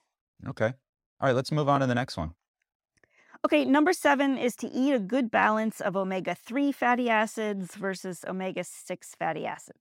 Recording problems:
none

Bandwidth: 16.5 kHz